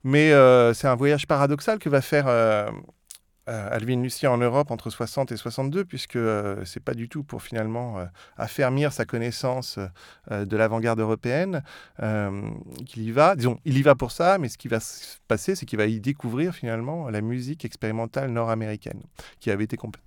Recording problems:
none

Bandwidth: 18.5 kHz